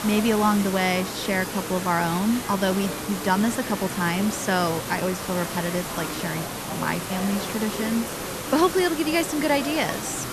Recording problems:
hiss; loud; throughout; 7 dB below the speech
murmuring crowd; noticeable; throughout; 10 dB below the speech

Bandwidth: 13.5 kHz